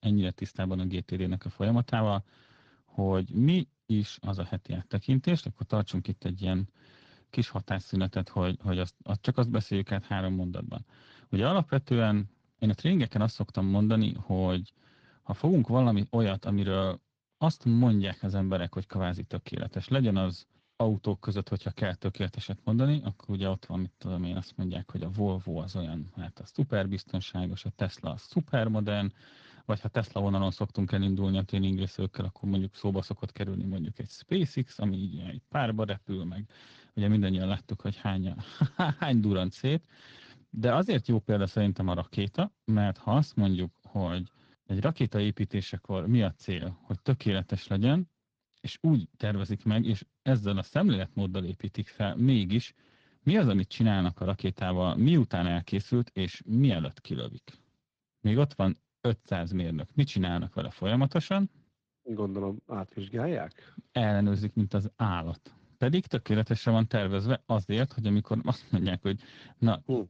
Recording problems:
garbled, watery; slightly

